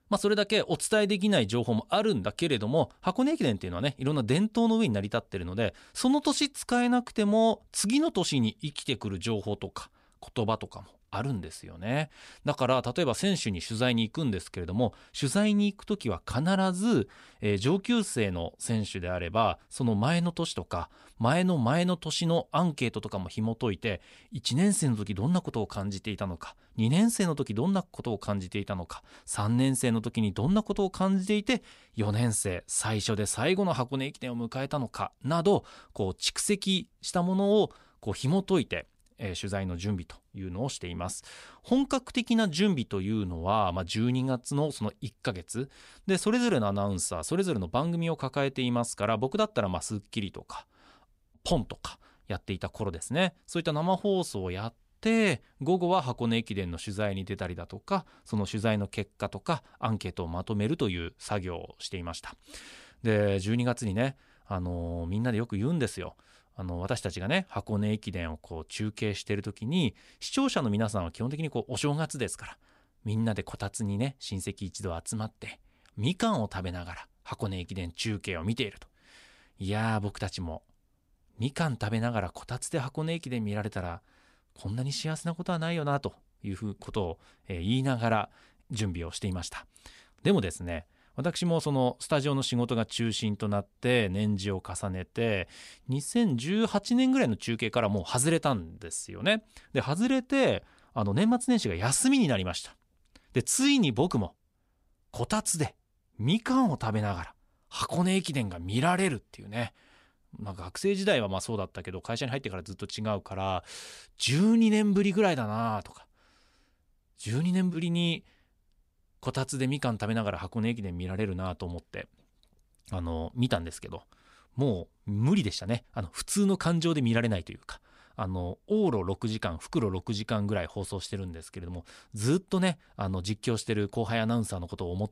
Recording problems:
none

